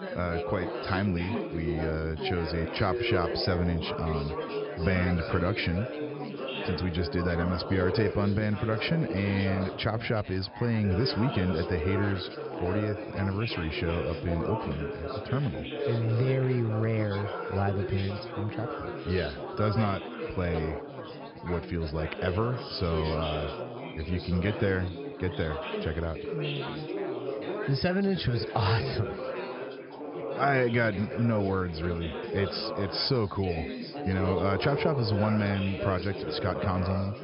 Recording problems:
high frequencies cut off; noticeable; nothing above 5.5 kHz
chatter from many people; loud; throughout; 5 dB below the speech

